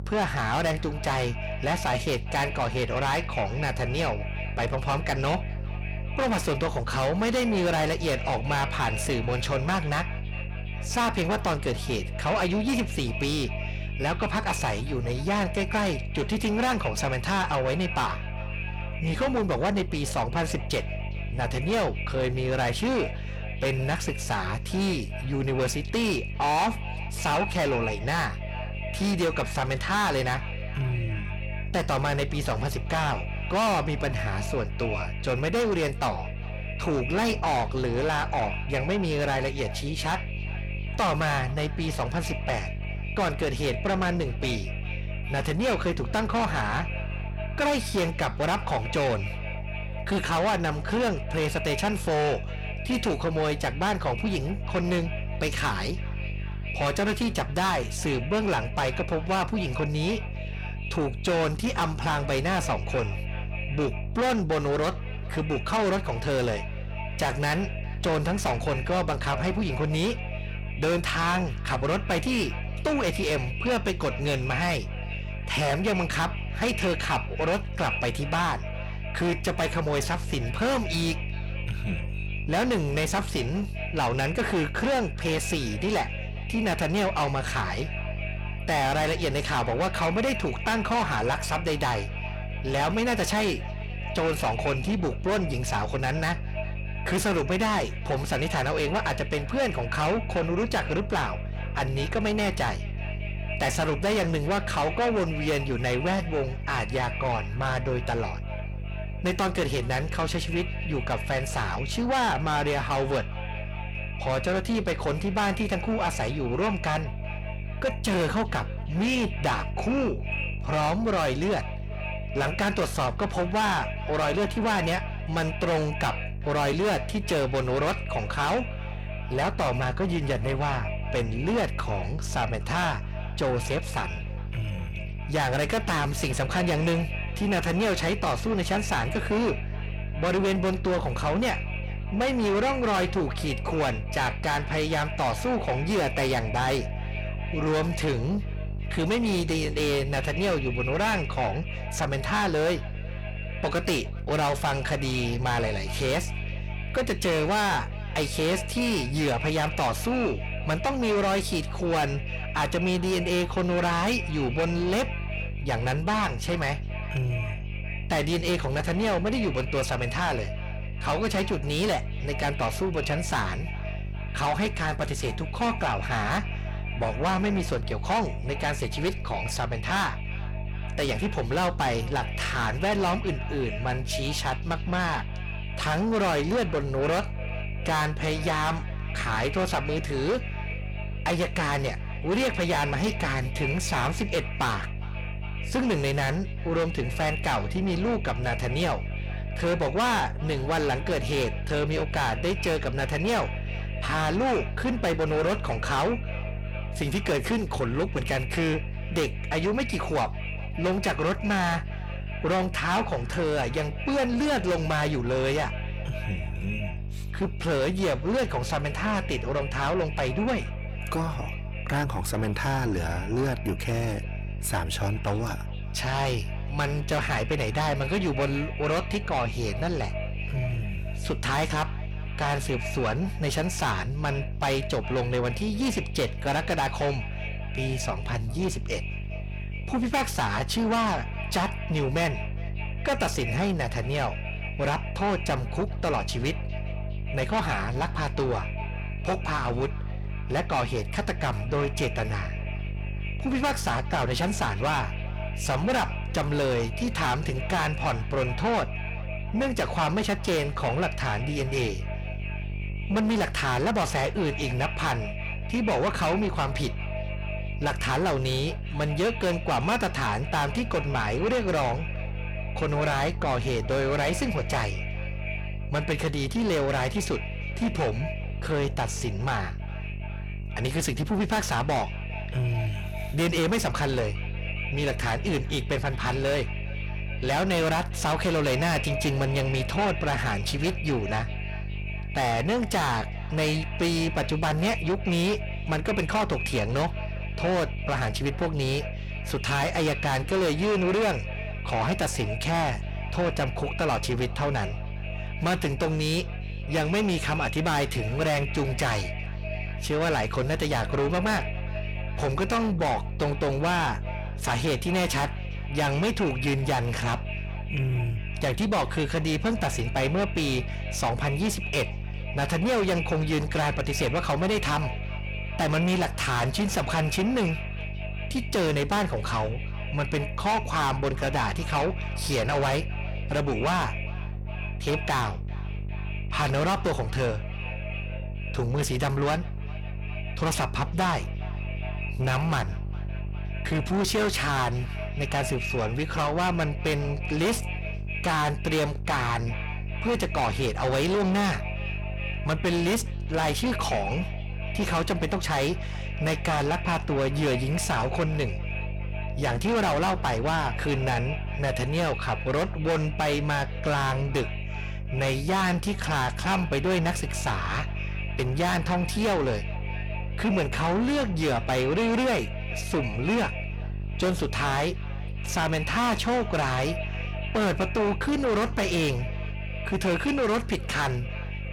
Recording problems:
distortion; heavy; 6 dB below the speech
echo of what is said; strong; throughout; 410 ms later, 10 dB below the speech
electrical hum; noticeable; throughout; 50 Hz, 15 dB below the speech

